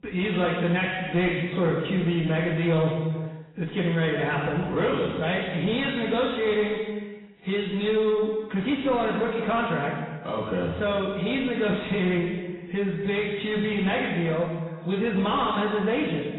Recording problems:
off-mic speech; far
garbled, watery; badly; nothing above 4 kHz
room echo; noticeable; dies away in 1.2 s
distortion; slight; 10 dB below the speech

